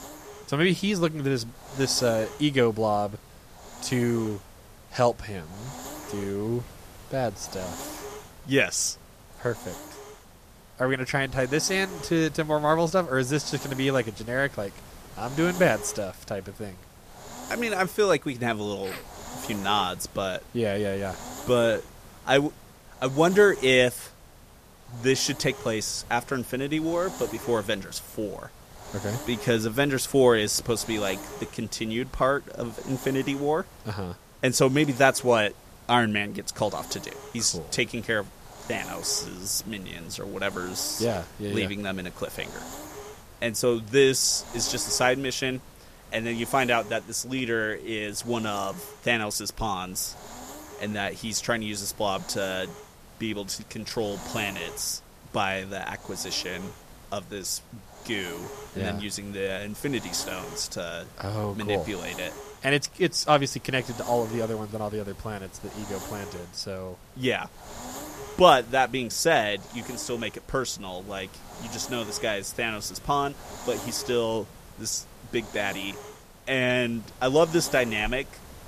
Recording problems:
hiss; noticeable; throughout; 15 dB below the speech

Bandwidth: 14.5 kHz